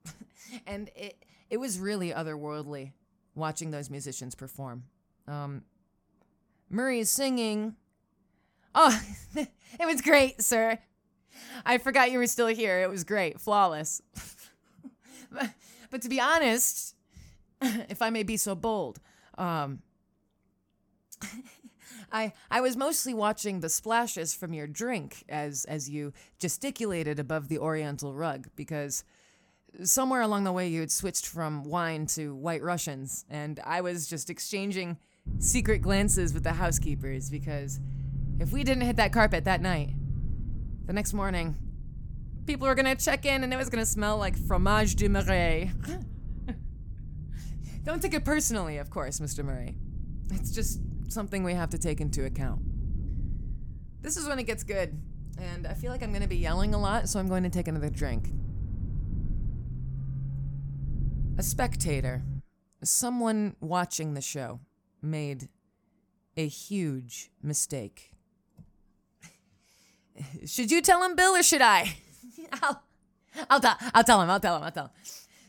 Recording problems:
low rumble; faint; from 35 s to 1:02; 20 dB below the speech

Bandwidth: 18 kHz